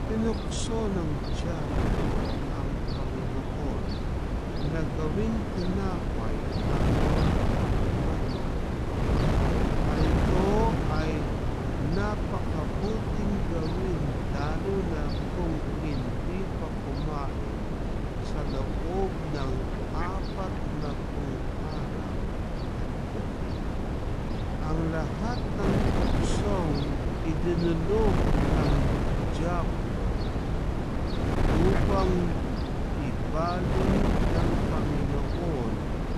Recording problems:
wrong speed, natural pitch; too slow; 0.6 times normal speed
wind noise on the microphone; heavy; 2 dB above the speech
animal sounds; loud; throughout; 8 dB below the speech

